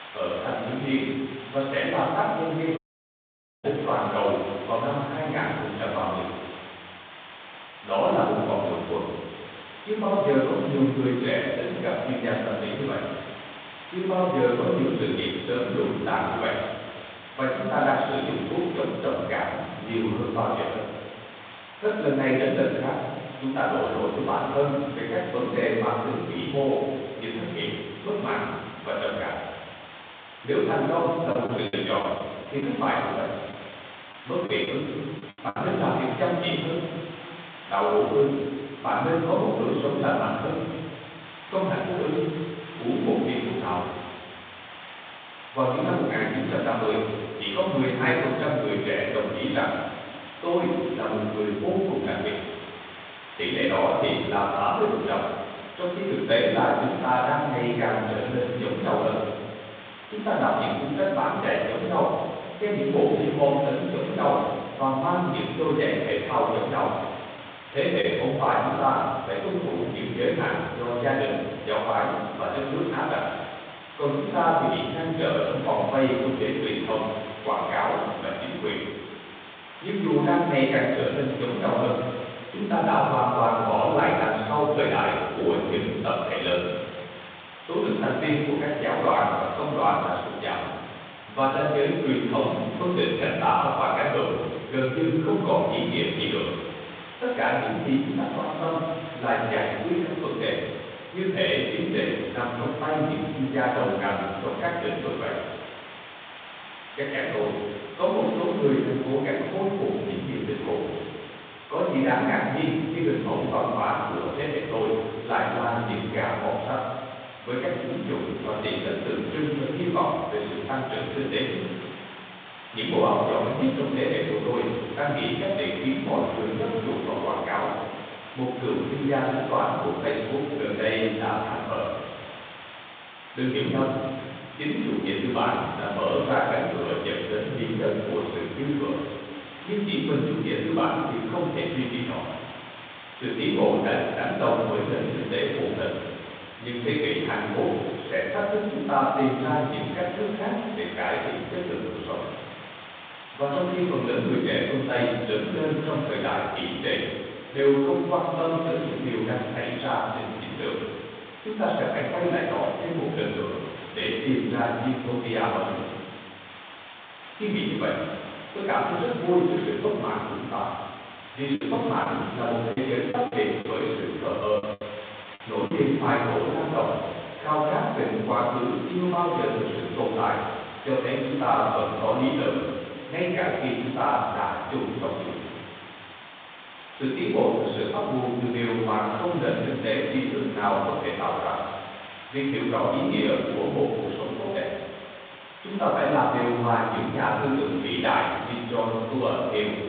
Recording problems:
room echo; strong; dies away in 1.3 s
off-mic speech; far
phone-call audio; nothing above 3.5 kHz
hiss; noticeable; throughout; 15 dB below the speech
audio cutting out; at 3 s for 1 s
choppy; very; from 31 to 36 s and from 2:52 to 2:56; 7% of the speech affected

